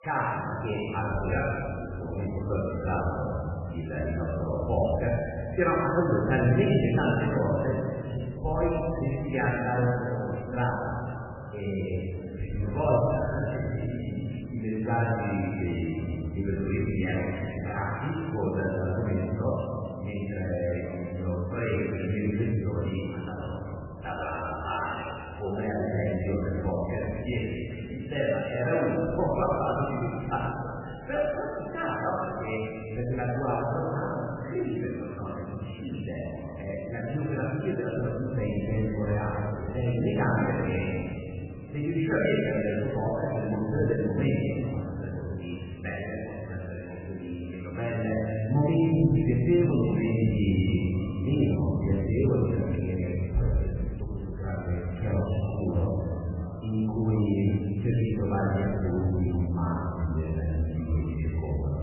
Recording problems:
room echo; strong; dies away in 2.5 s
off-mic speech; far
garbled, watery; badly; nothing above 3 kHz
voice in the background; faint; throughout; 20 dB below the speech

